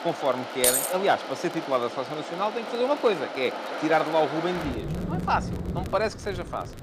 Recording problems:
rain or running water; loud; throughout; 7 dB below the speech
crackle, like an old record; faint; 25 dB below the speech
jangling keys; loud; at 0.5 s; peak 5 dB above the speech
phone ringing; noticeable; at 5 s; peak 8 dB below the speech

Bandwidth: 15 kHz